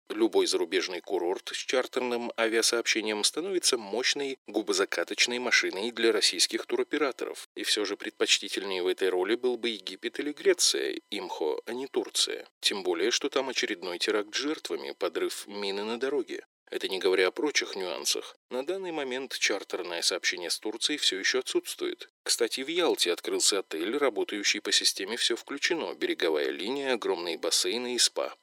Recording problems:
thin; very; fading below 350 Hz

